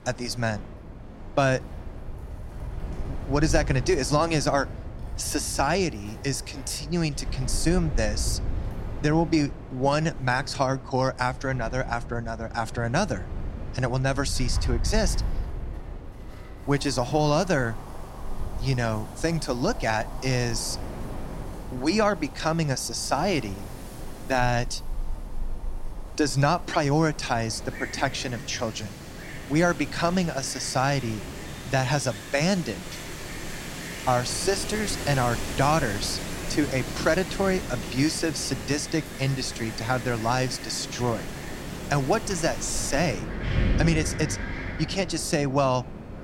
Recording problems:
wind in the background; loud; throughout; 9 dB below the speech

